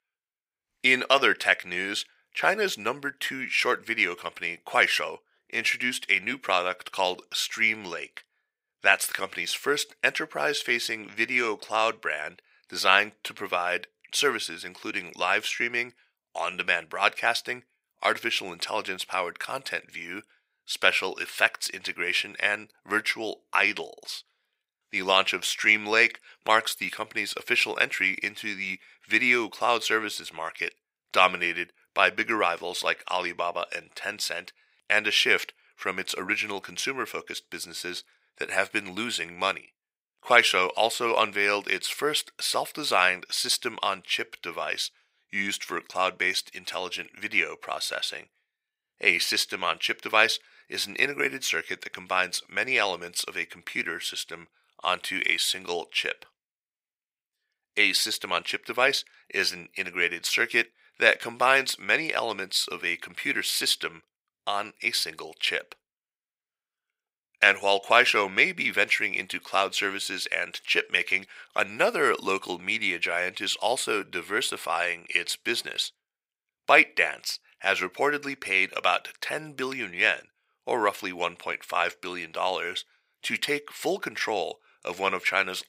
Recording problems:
thin; very; fading below 450 Hz

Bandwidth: 15.5 kHz